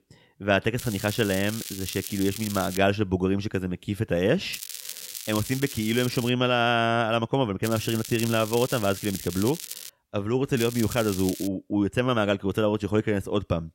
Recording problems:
crackling; noticeable; 4 times, first at 1 s; 10 dB below the speech

